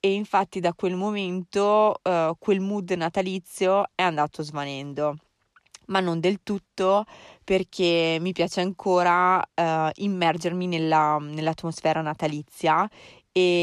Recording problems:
abrupt cut into speech; at the end

